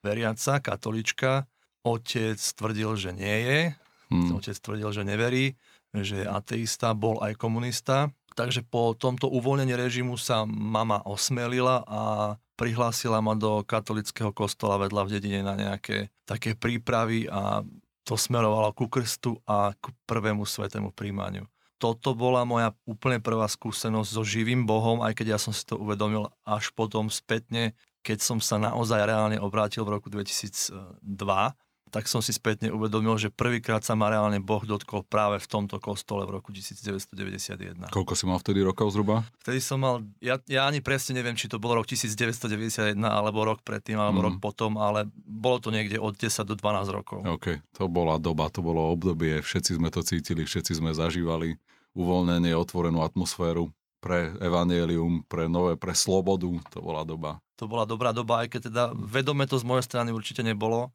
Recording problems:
none

